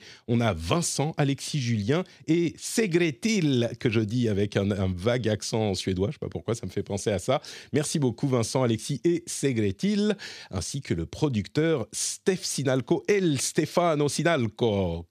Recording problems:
none

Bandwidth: 14.5 kHz